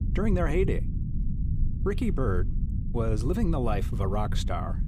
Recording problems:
low rumble; noticeable; throughout; 10 dB below the speech

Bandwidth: 15.5 kHz